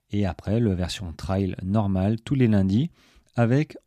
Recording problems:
none

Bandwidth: 14.5 kHz